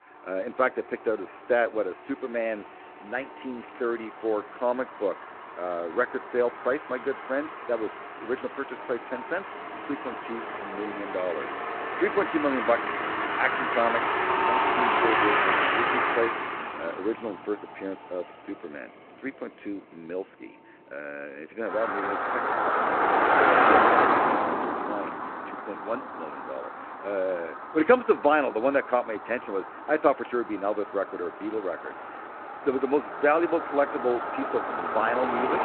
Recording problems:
phone-call audio; nothing above 3.5 kHz
traffic noise; very loud; throughout; 3 dB above the speech

